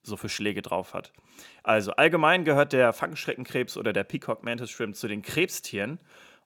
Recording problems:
none

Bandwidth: 17 kHz